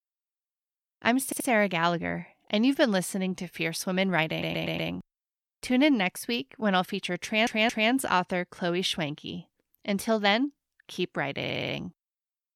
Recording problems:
audio stuttering; 4 times, first at 1 s

